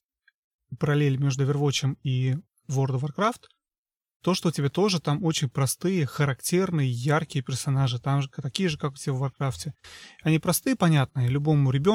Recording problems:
abrupt cut into speech; at the end

